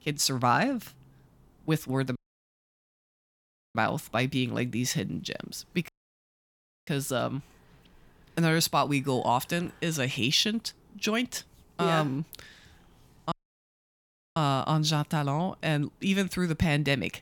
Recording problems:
audio cutting out; at 2 s for 1.5 s, at 6 s for 1 s and at 13 s for 1 s

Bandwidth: 18 kHz